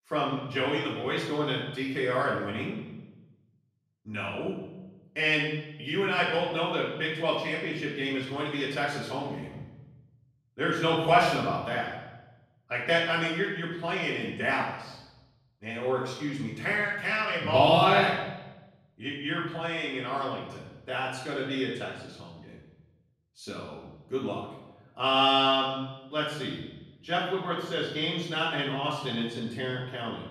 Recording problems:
off-mic speech; far
room echo; noticeable; dies away in 0.9 s

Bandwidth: 15 kHz